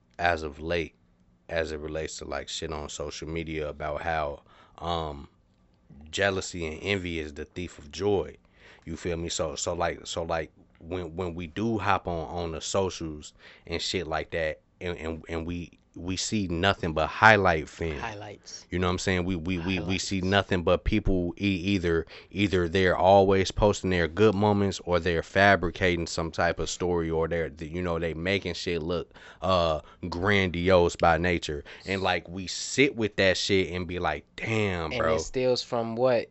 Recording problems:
high frequencies cut off; noticeable; nothing above 7.5 kHz

